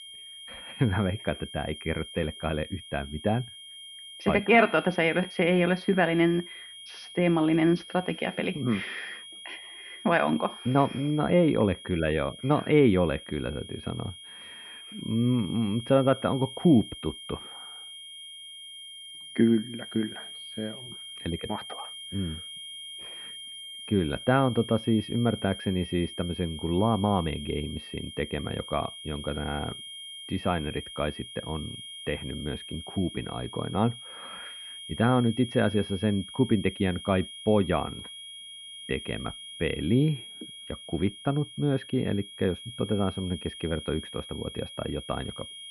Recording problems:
muffled; very; fading above 2.5 kHz
high-pitched whine; noticeable; throughout; 3 kHz, 15 dB below the speech

